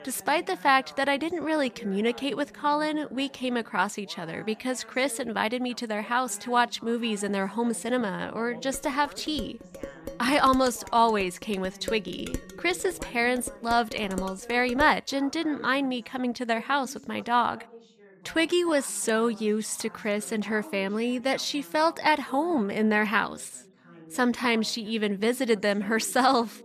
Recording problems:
background chatter; faint; throughout; 2 voices, 20 dB below the speech
clattering dishes; faint; from 8.5 to 15 s; peak 10 dB below the speech

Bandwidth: 14.5 kHz